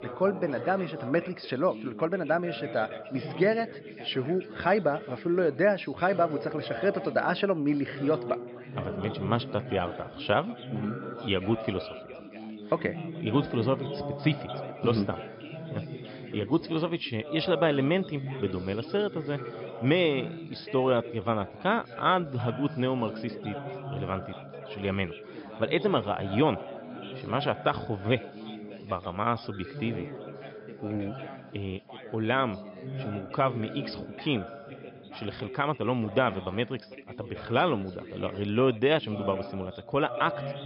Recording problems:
high frequencies cut off; noticeable; nothing above 5.5 kHz
background chatter; noticeable; throughout; 3 voices, 10 dB below the speech

